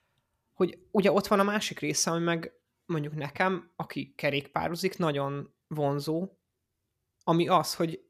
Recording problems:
none

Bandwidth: 14.5 kHz